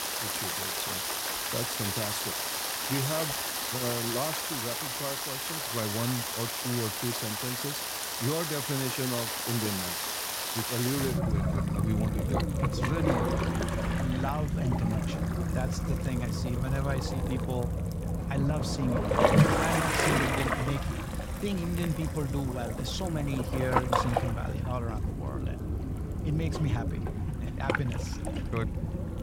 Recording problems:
rain or running water; very loud; throughout; 4 dB above the speech

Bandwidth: 16 kHz